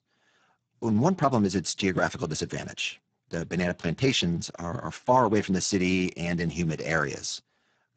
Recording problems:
garbled, watery; badly; nothing above 7.5 kHz

